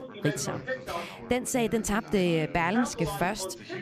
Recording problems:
background chatter; loud; throughout; 3 voices, 9 dB below the speech

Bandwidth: 14.5 kHz